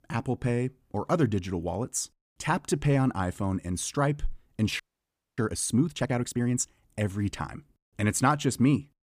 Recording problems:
audio freezing; at 5 s for 0.5 s

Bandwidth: 15 kHz